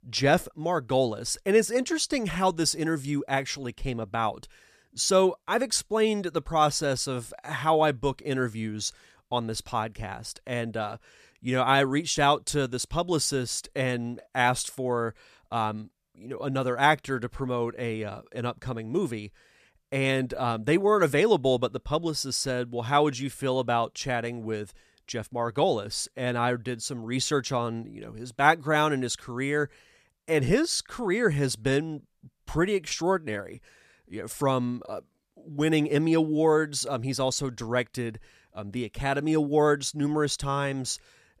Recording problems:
none

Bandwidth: 14.5 kHz